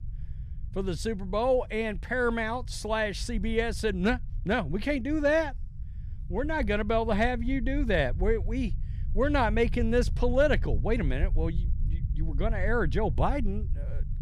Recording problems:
low rumble; faint; throughout; 25 dB below the speech

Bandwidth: 14.5 kHz